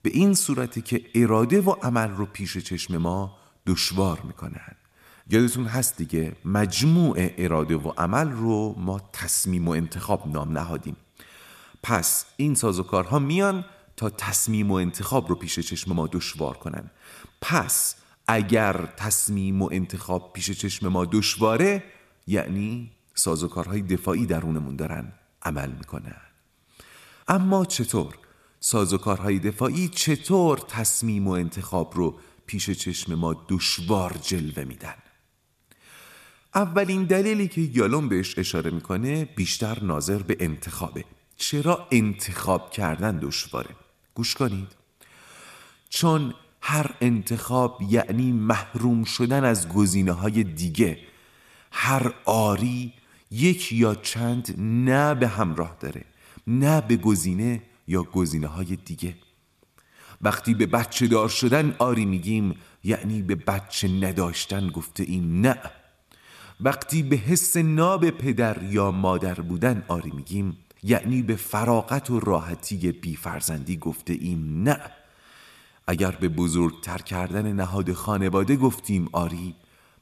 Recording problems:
echo of what is said; faint; throughout; 100 ms later, 25 dB below the speech

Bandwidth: 14 kHz